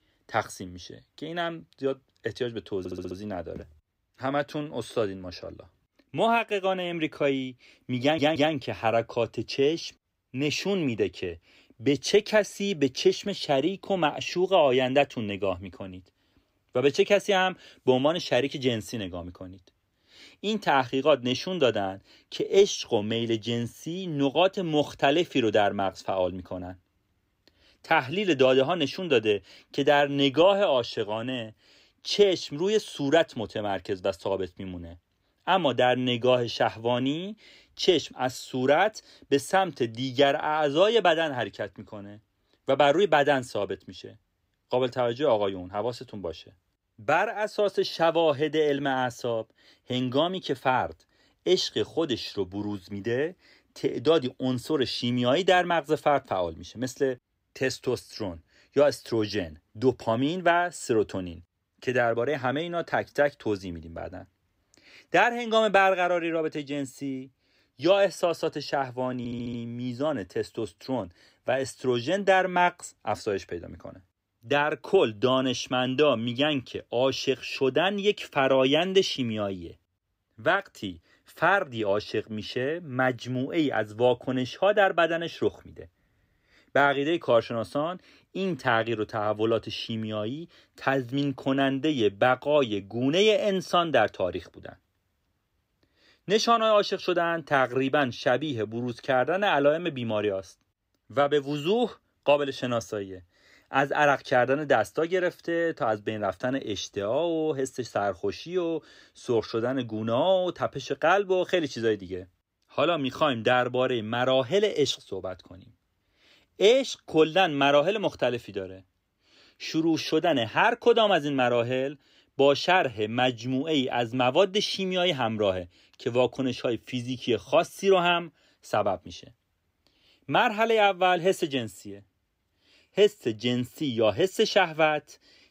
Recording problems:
audio stuttering; at 3 s, at 8 s and at 1:09

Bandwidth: 15.5 kHz